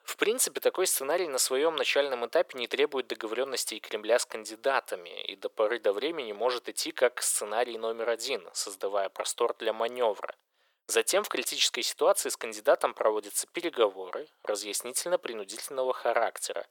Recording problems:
thin; very; fading below 450 Hz

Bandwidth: 18 kHz